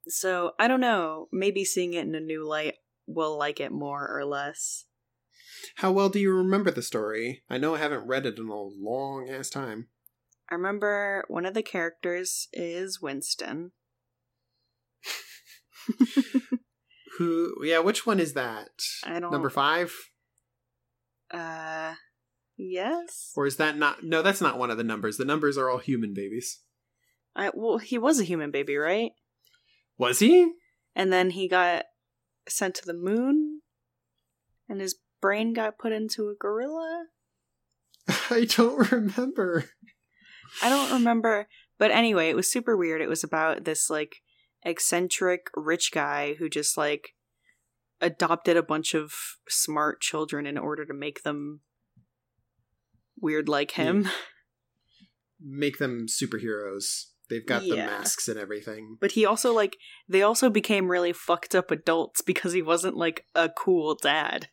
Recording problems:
none

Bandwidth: 16.5 kHz